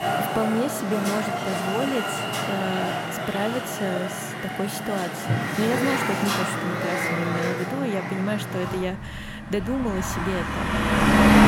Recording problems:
traffic noise; very loud; throughout; 3 dB above the speech

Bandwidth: 16 kHz